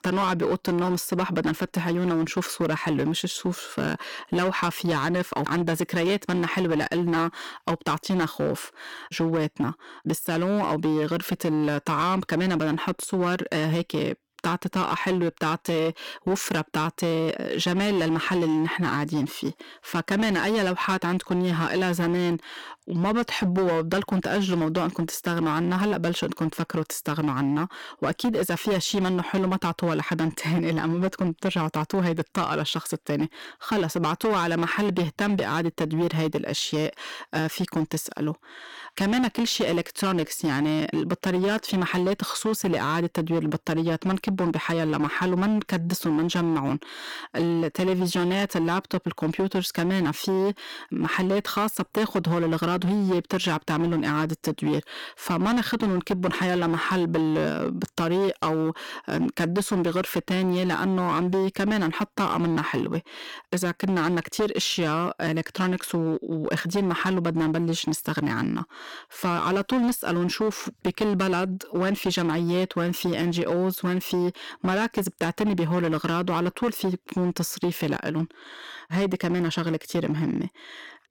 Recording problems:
distortion; slight; 15% of the sound clipped

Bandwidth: 17.5 kHz